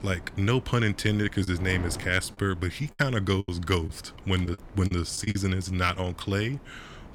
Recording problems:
wind noise on the microphone; occasional gusts; 20 dB below the speech
choppy; very; 6% of the speech affected

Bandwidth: 18.5 kHz